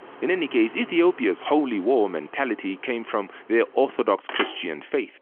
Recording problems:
phone-call audio; nothing above 3 kHz
traffic noise; noticeable; throughout; 15 dB below the speech

